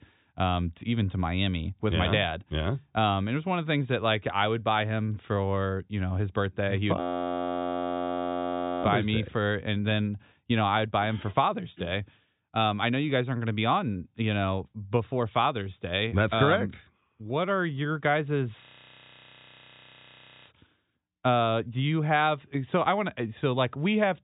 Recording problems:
high frequencies cut off; severe; nothing above 4 kHz
audio freezing; at 7 s for 2 s and at 19 s for 2 s

